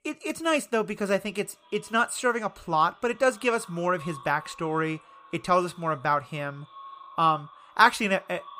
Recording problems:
echo of what is said; faint; throughout; 380 ms later, 25 dB below the speech

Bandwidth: 15 kHz